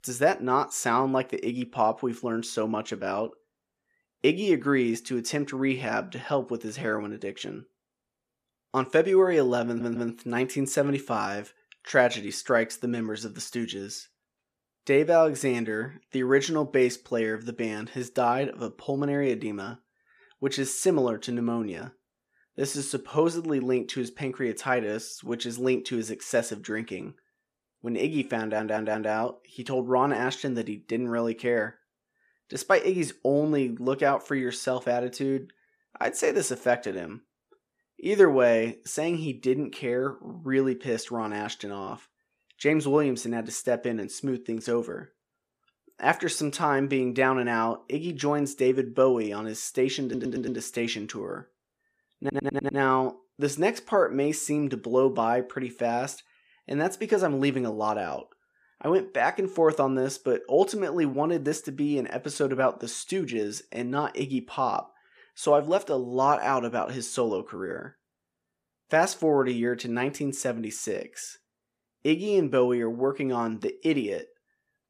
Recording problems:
audio stuttering; 4 times, first at 9.5 s

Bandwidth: 14.5 kHz